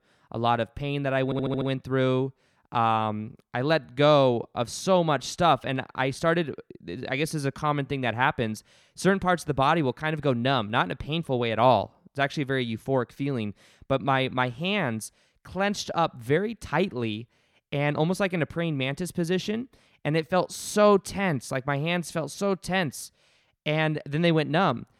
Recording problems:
audio stuttering; at 1.5 s

